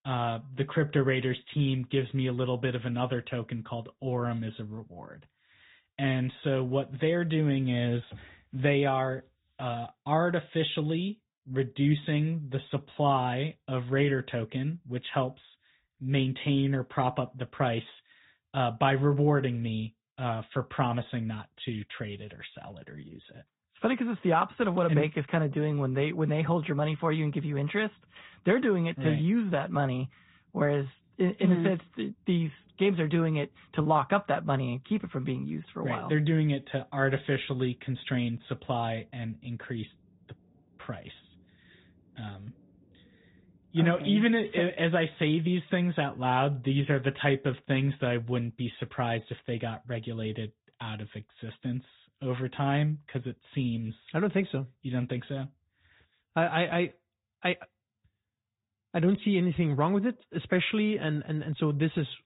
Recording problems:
high frequencies cut off; severe; nothing above 4 kHz
garbled, watery; slightly

